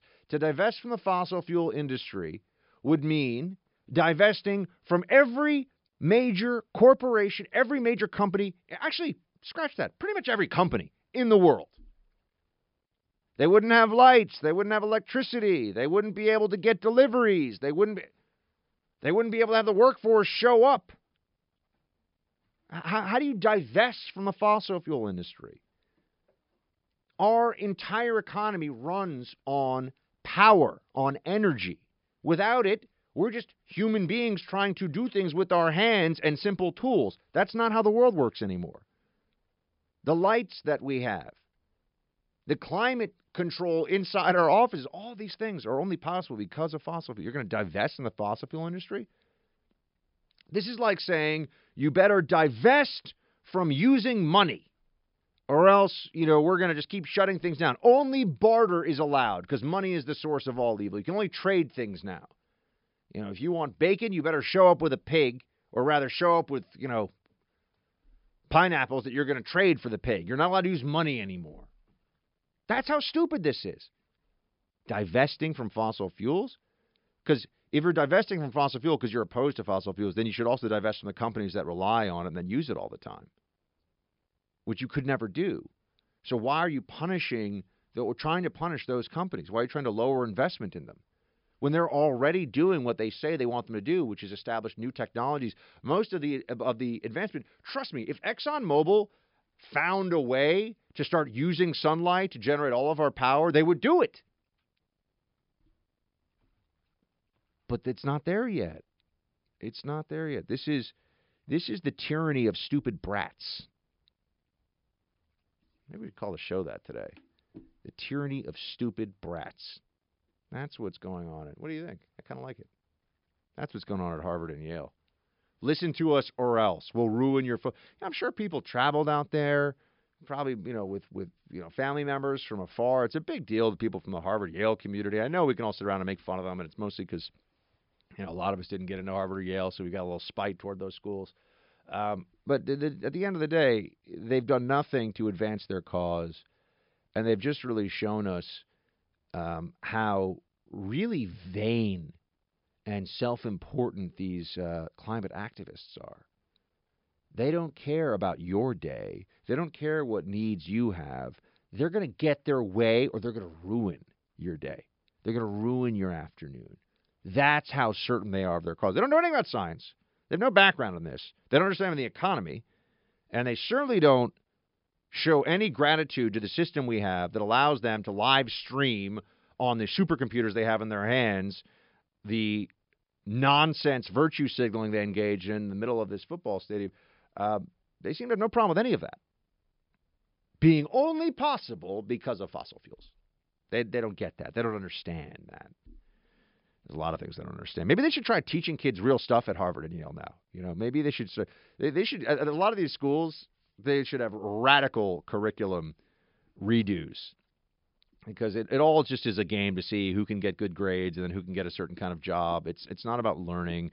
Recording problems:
high frequencies cut off; noticeable; nothing above 5.5 kHz

